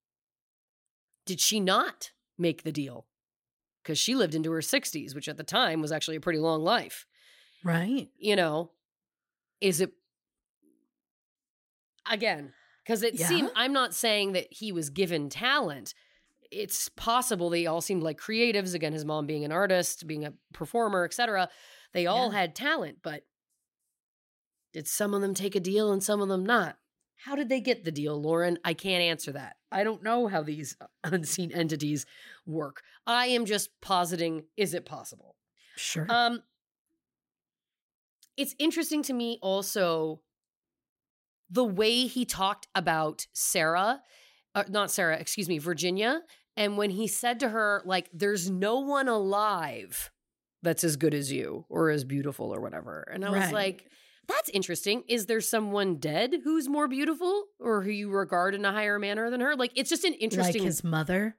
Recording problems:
uneven, jittery; strongly; from 5.5 to 58 s

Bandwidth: 16 kHz